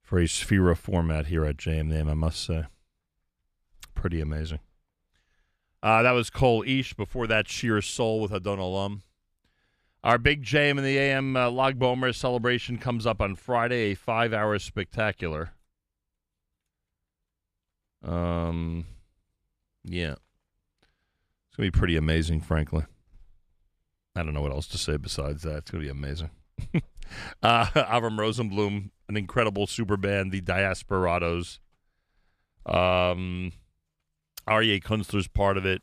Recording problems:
none

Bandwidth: 14.5 kHz